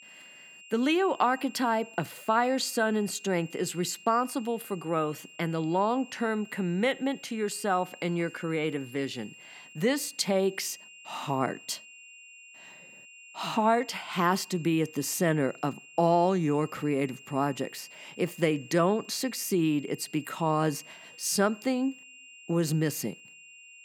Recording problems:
high-pitched whine; noticeable; throughout; 3 kHz, 20 dB below the speech

